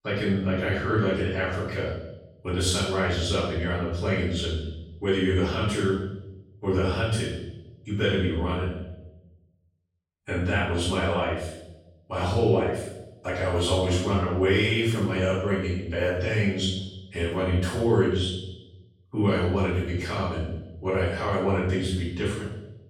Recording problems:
off-mic speech; far
room echo; noticeable; dies away in 0.8 s

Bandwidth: 16.5 kHz